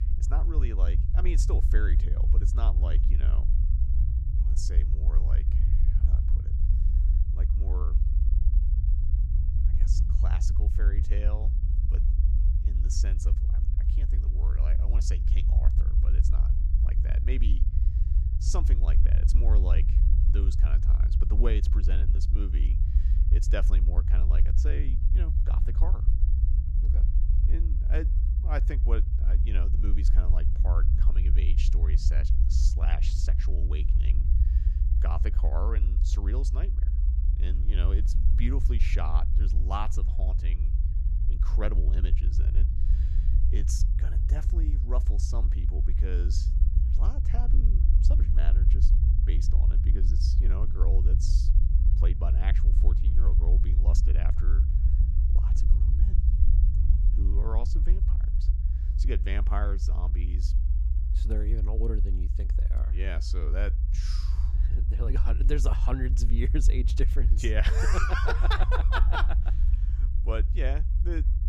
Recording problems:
low rumble; loud; throughout; 7 dB below the speech

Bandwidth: 15.5 kHz